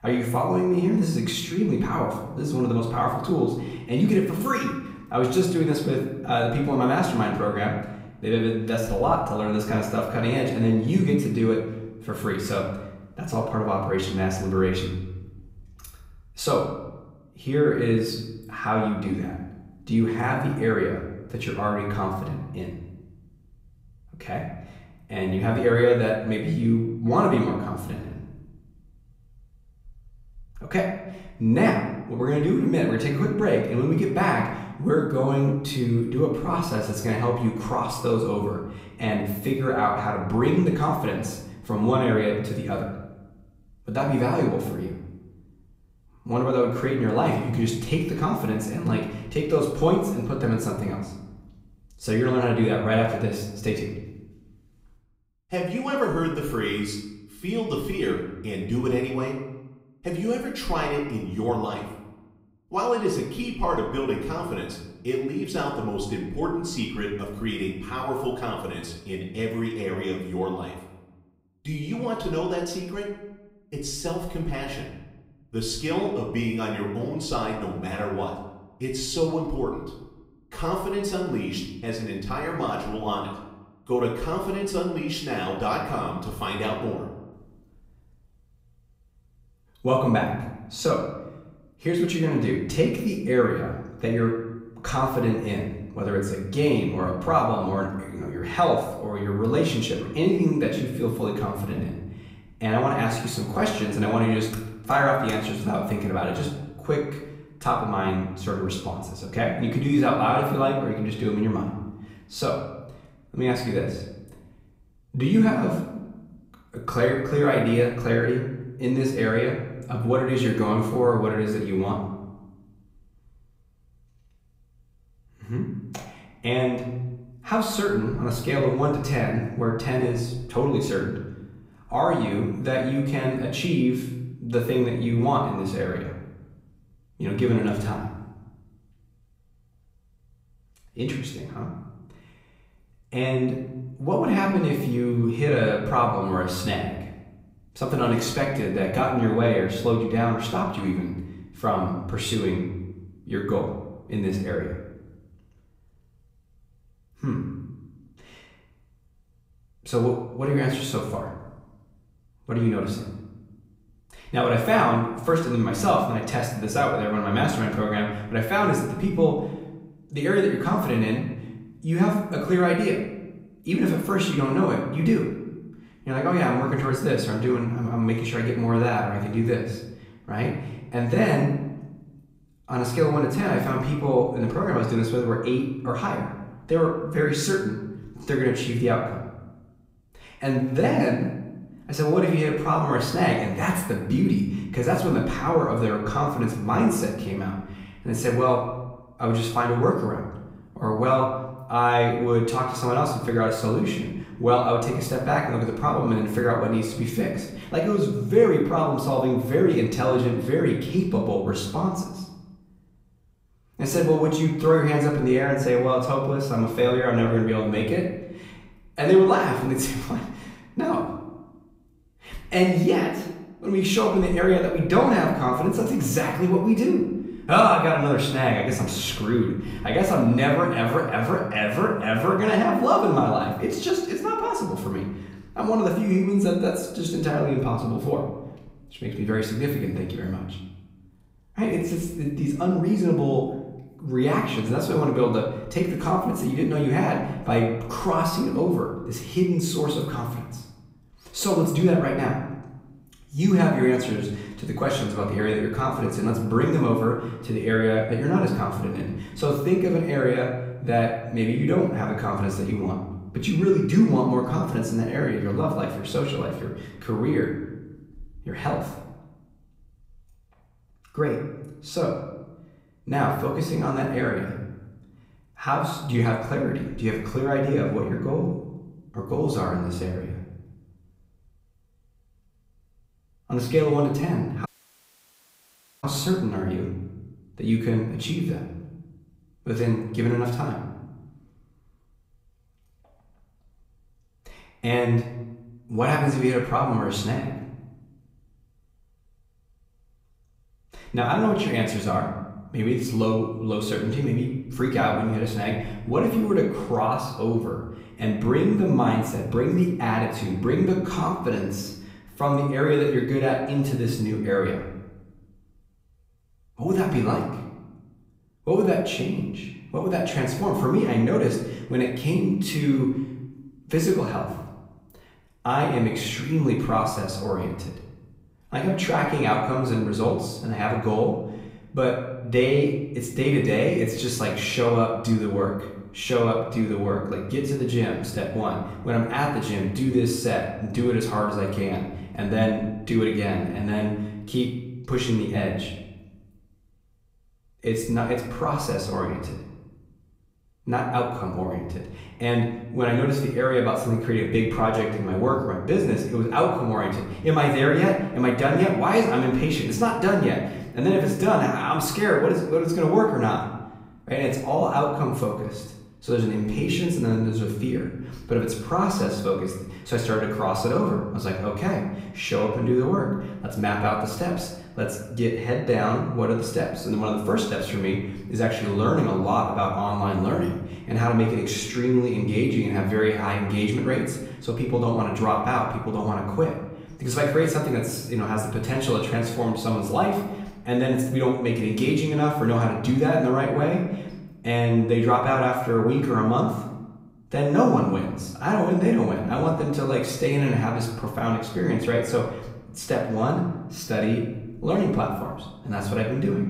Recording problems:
off-mic speech; far
room echo; noticeable; dies away in 0.9 s
audio cutting out; at 4:45 for 1.5 s

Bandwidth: 15.5 kHz